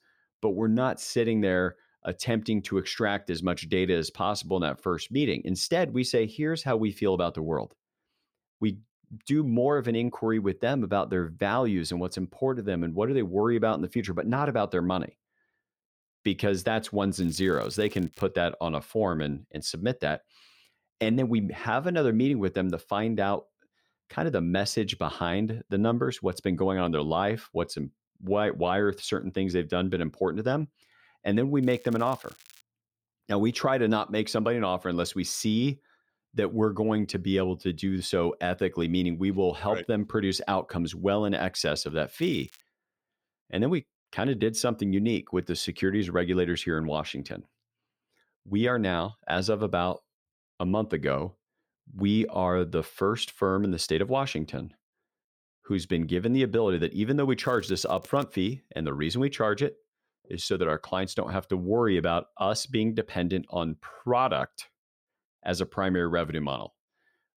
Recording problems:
crackling; faint; 4 times, first at 17 s; 25 dB below the speech

